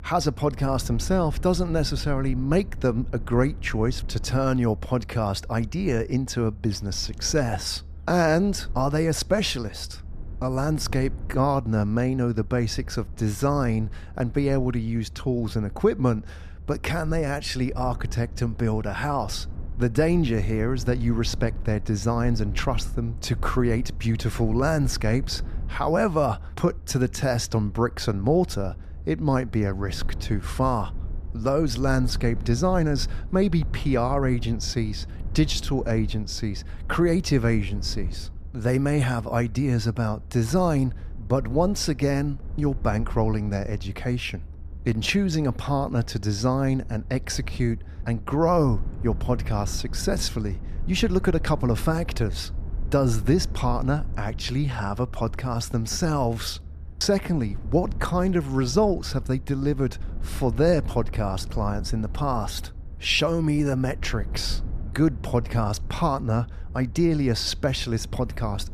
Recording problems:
low rumble; faint; throughout; 25 dB below the speech

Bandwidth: 14.5 kHz